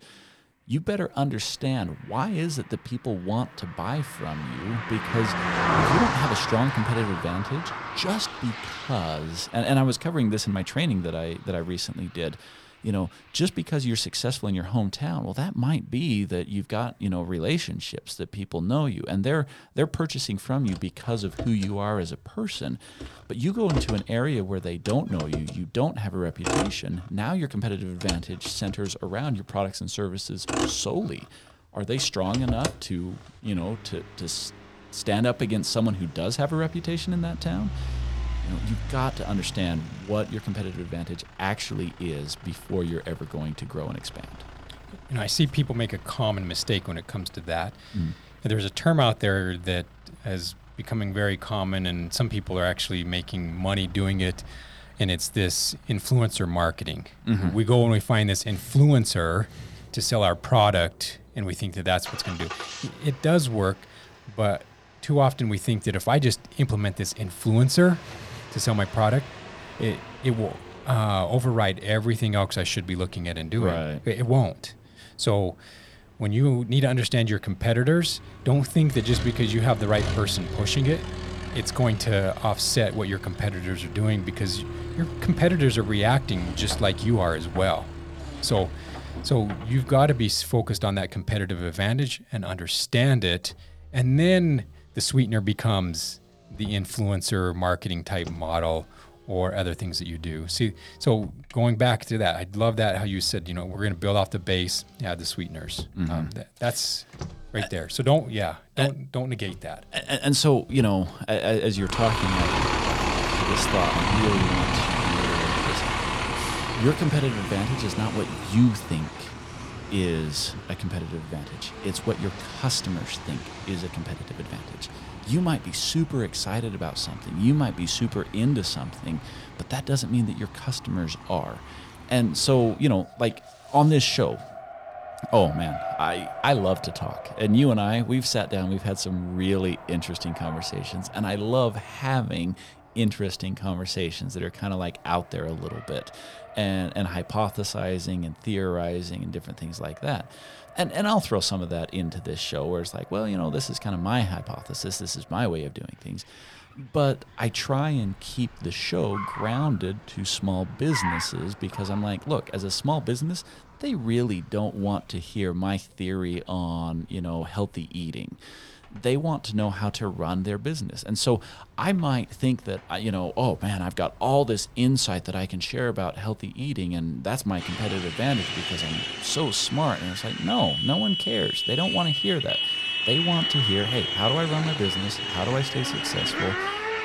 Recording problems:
traffic noise; loud; throughout; 5 dB below the speech

